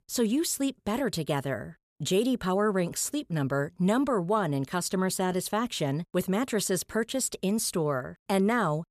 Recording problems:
none

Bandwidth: 14.5 kHz